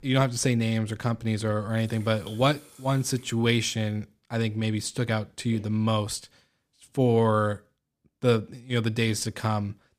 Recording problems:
household noises; faint; until 3.5 s; 25 dB below the speech

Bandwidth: 15 kHz